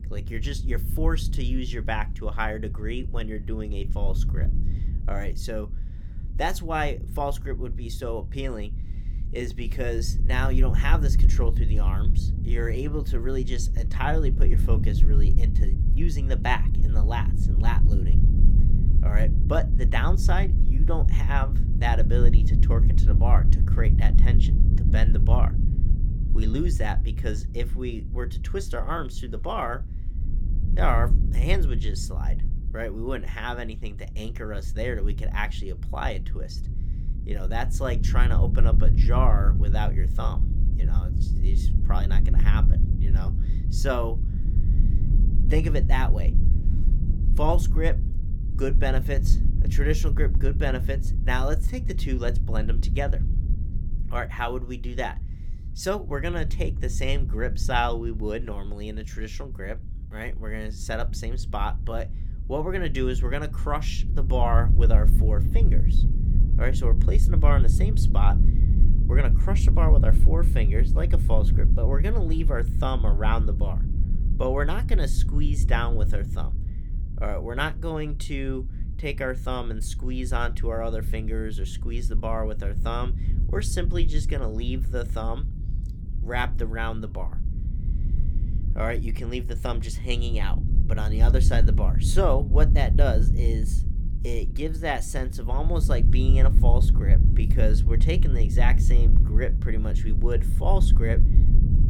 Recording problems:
low rumble; loud; throughout; 10 dB below the speech

